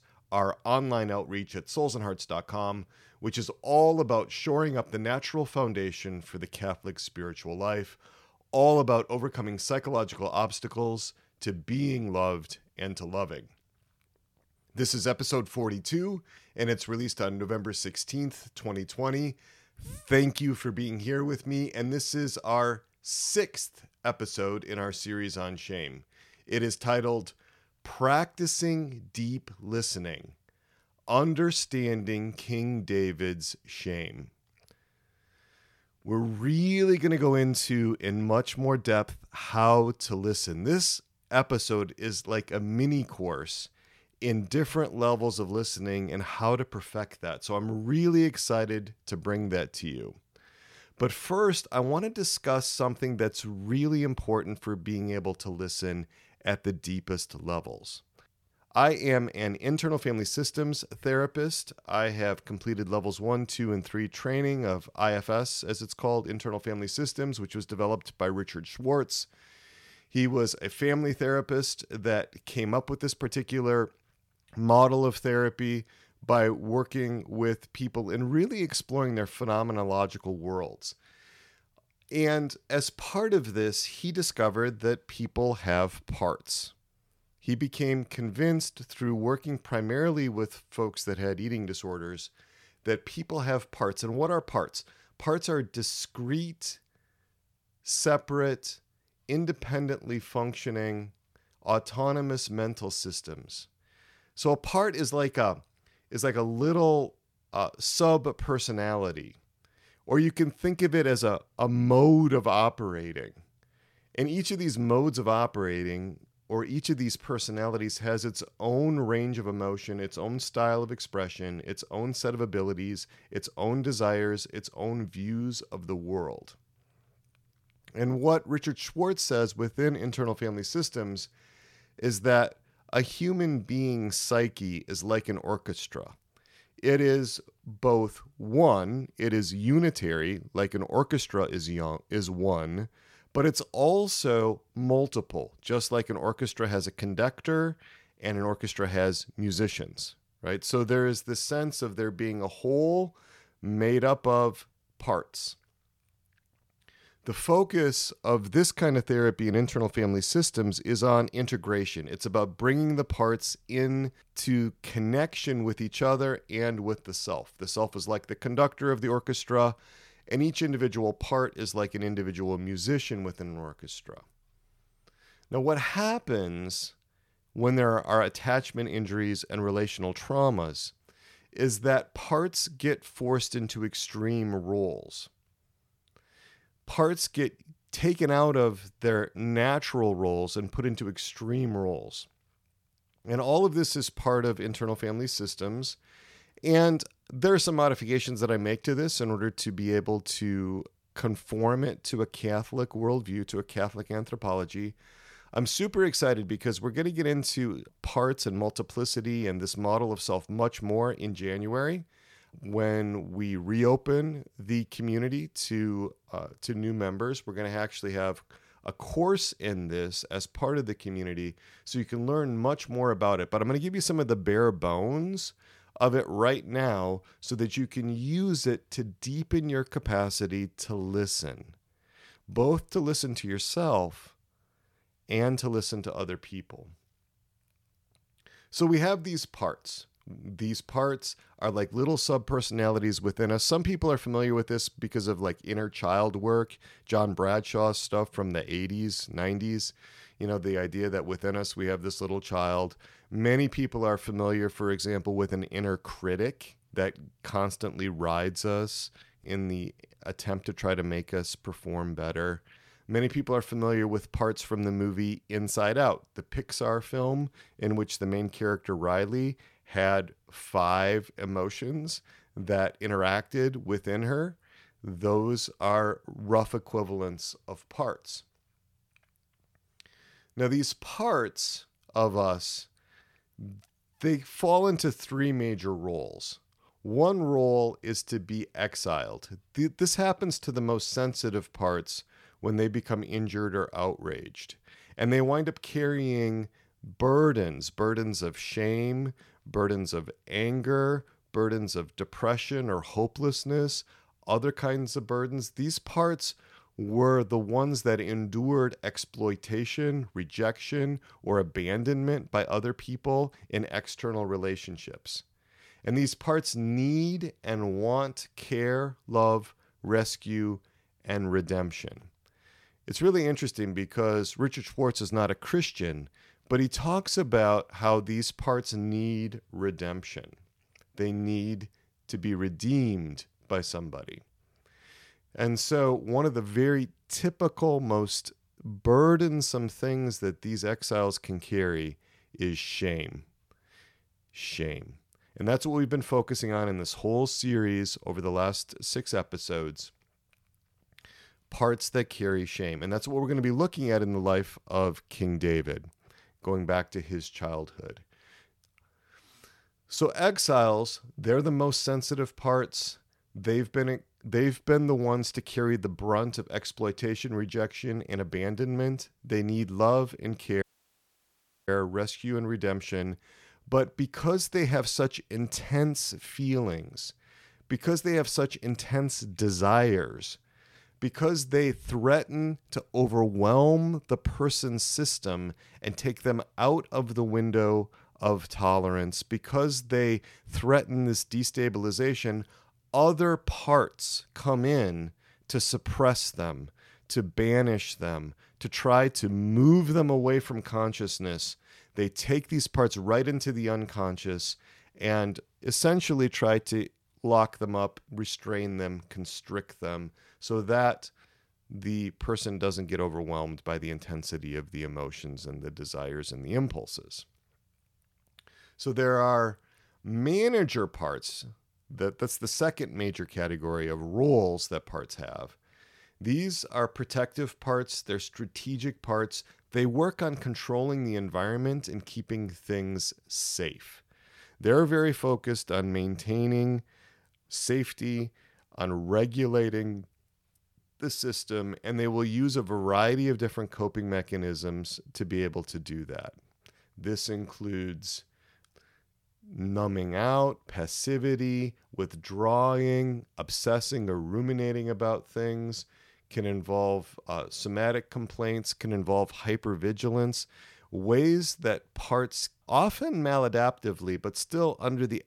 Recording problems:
audio cutting out; at 6:11 for 1 s

